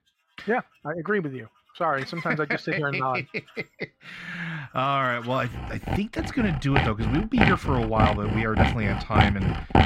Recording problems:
muffled; slightly; fading above 4 kHz
machinery noise; very loud; throughout; 1 dB above the speech

